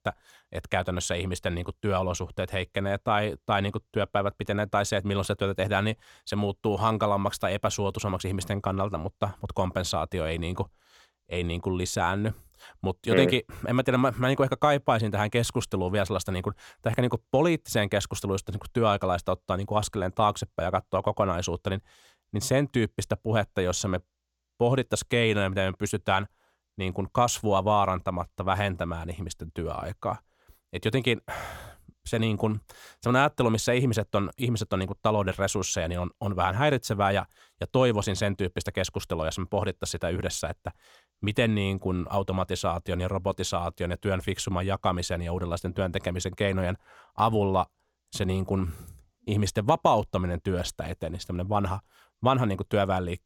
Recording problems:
none

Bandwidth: 17 kHz